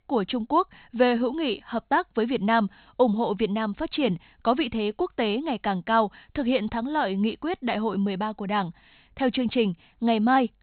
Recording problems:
high frequencies cut off; severe; nothing above 4 kHz

